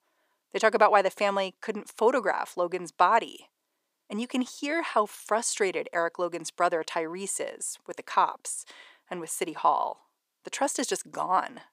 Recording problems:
thin; somewhat; fading below 500 Hz

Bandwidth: 15 kHz